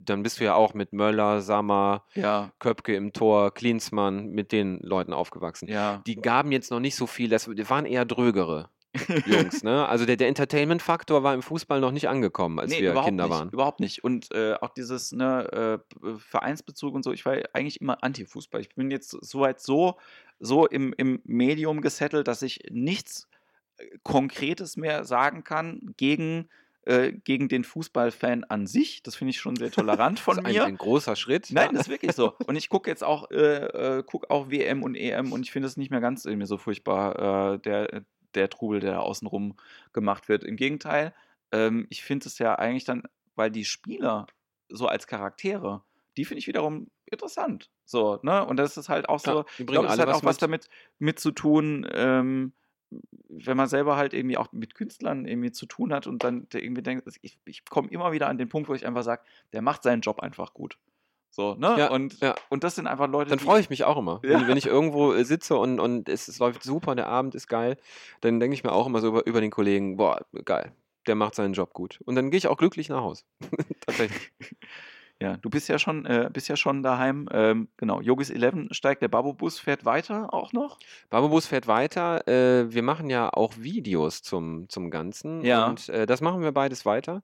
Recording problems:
none

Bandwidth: 16.5 kHz